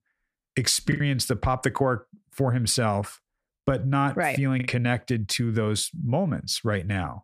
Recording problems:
choppy; occasionally; 3% of the speech affected

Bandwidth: 14.5 kHz